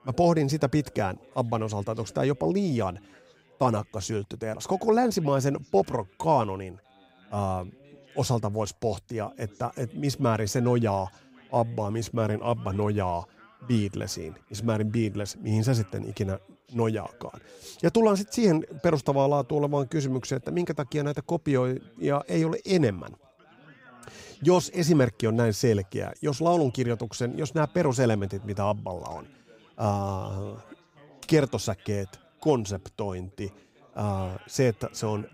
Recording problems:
background chatter; faint; throughout; 4 voices, 30 dB below the speech

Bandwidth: 15.5 kHz